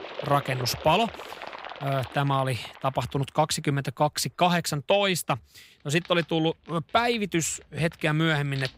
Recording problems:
animal sounds; noticeable; throughout; 15 dB below the speech

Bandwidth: 15.5 kHz